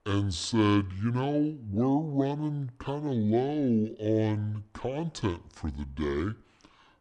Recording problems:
wrong speed and pitch; too slow and too low; 0.6 times normal speed

